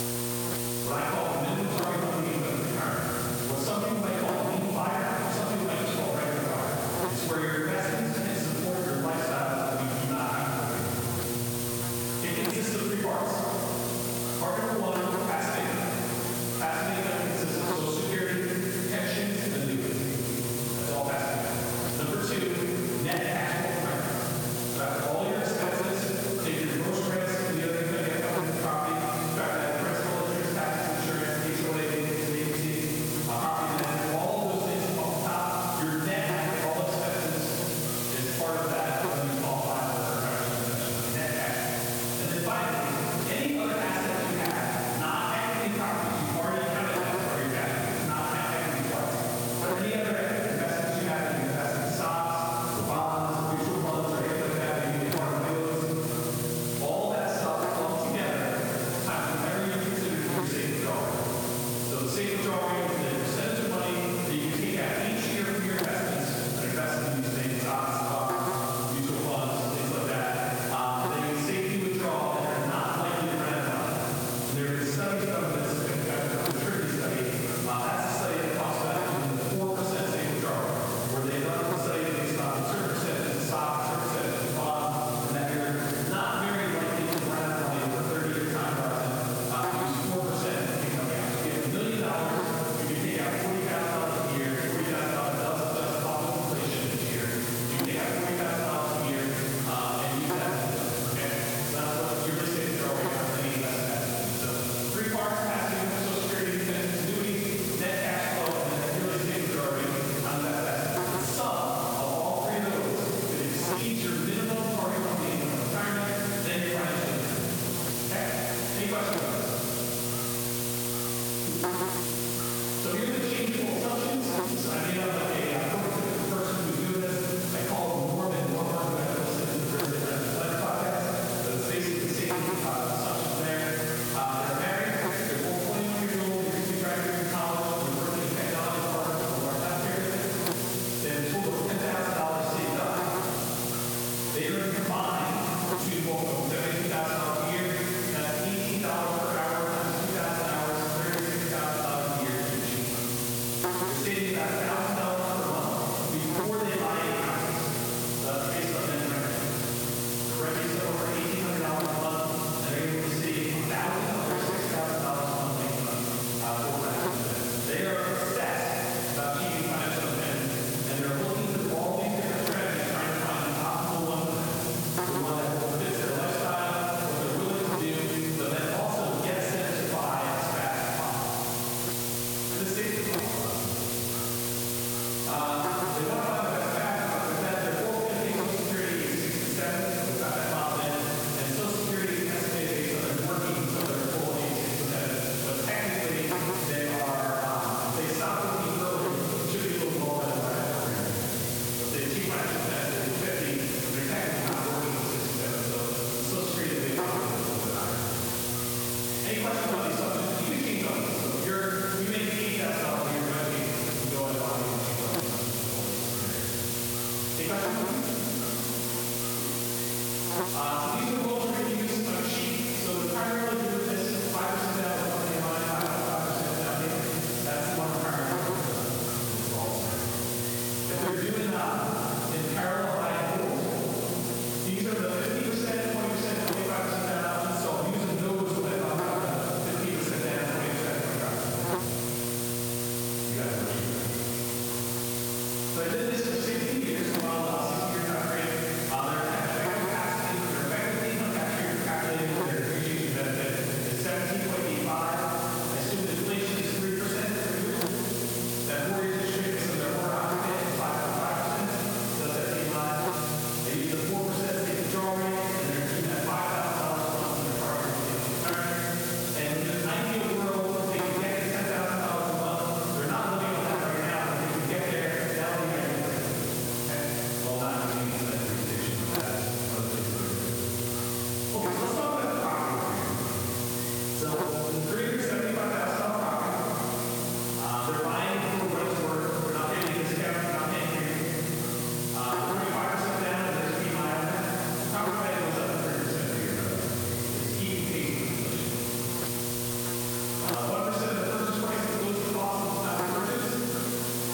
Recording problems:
room echo; strong; dies away in 3 s
off-mic speech; far
squashed, flat; somewhat
electrical hum; loud; throughout; 60 Hz, 7 dB below the speech
hiss; loud; throughout; 5 dB below the speech

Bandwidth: 18 kHz